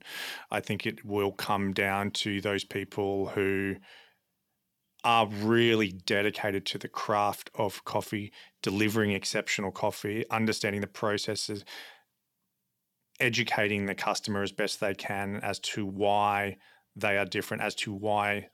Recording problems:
none

